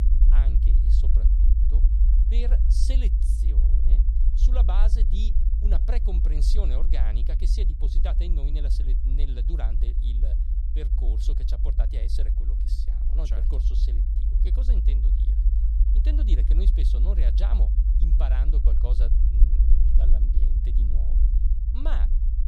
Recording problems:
low rumble; loud; throughout; 3 dB below the speech

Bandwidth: 13.5 kHz